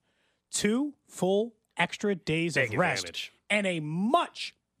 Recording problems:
none

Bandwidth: 15 kHz